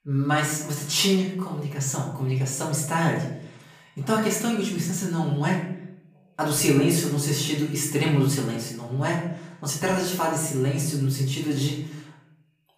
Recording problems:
off-mic speech; far
room echo; noticeable; dies away in 0.6 s

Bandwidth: 15 kHz